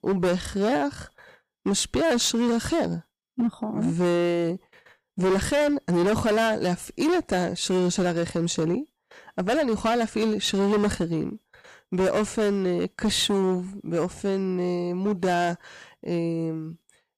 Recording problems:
distortion; heavy; 13% of the sound clipped

